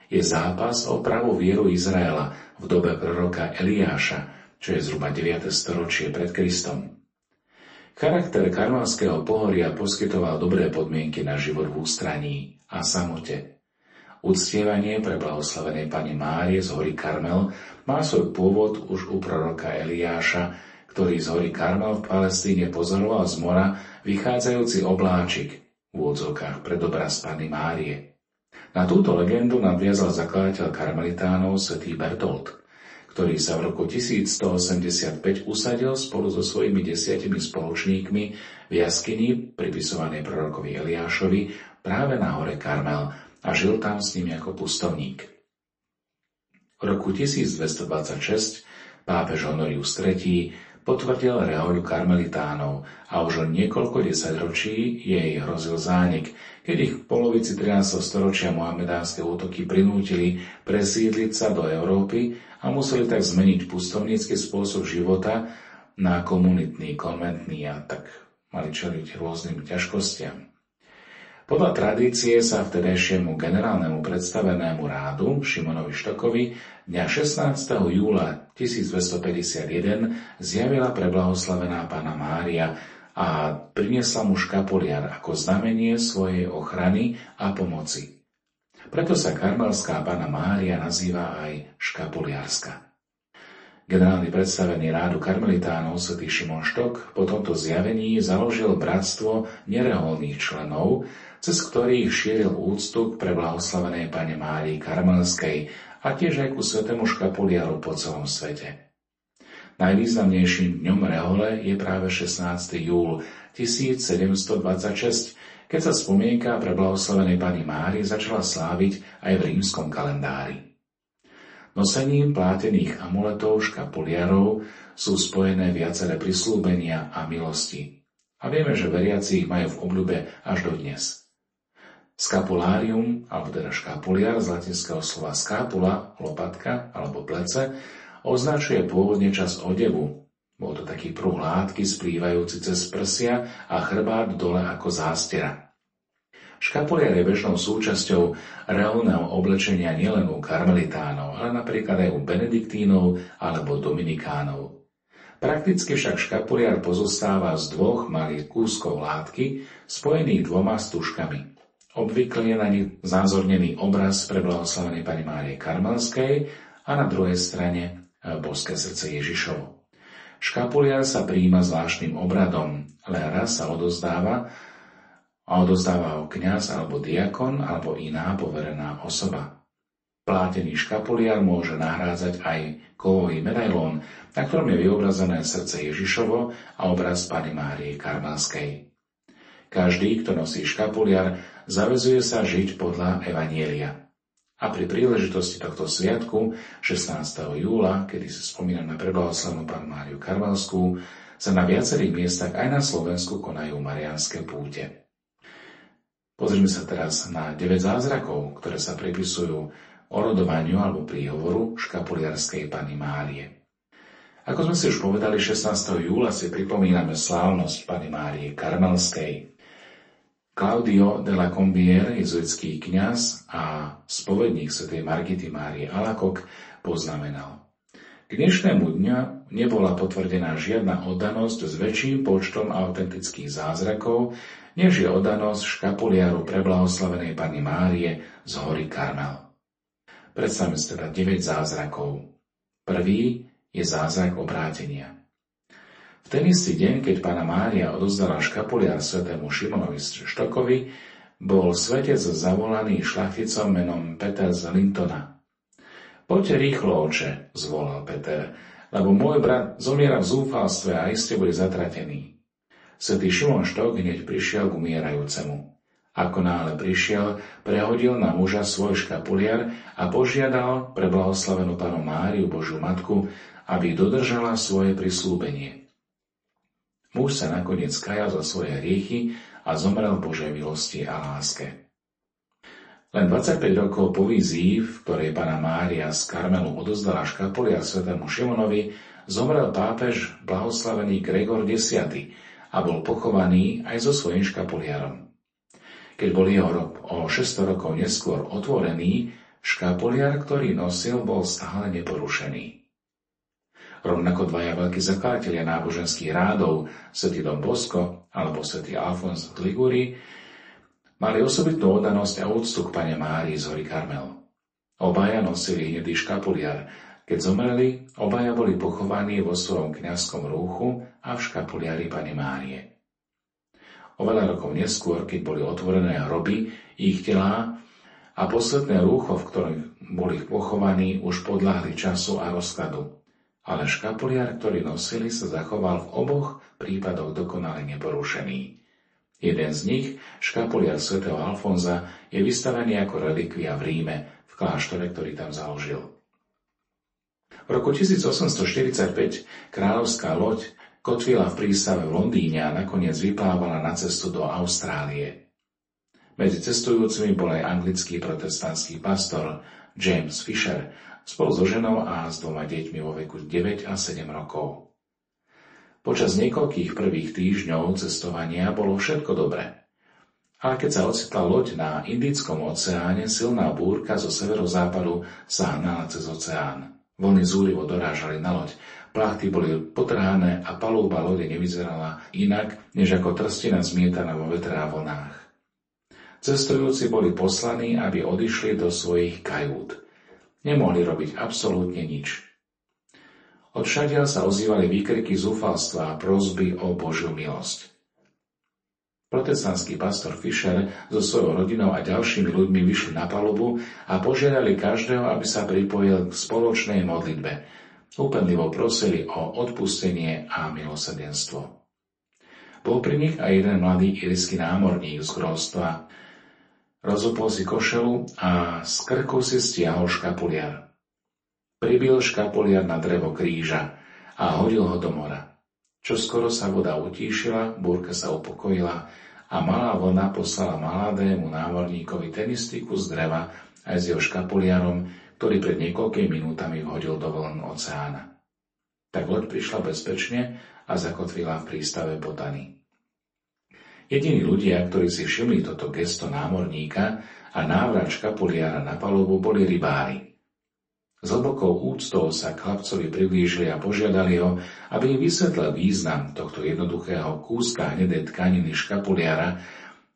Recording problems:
off-mic speech; far
room echo; slight; dies away in 0.3 s
garbled, watery; slightly; nothing above 8 kHz

